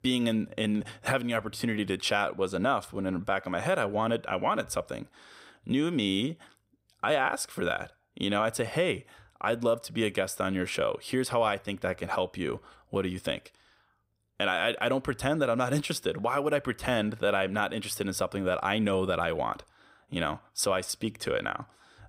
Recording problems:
none

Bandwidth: 15.5 kHz